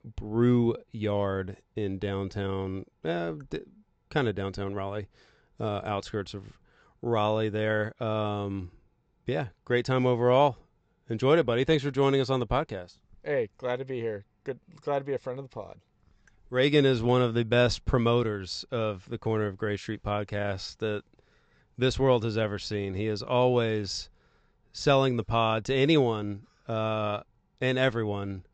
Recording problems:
high frequencies cut off; noticeable; nothing above 8 kHz

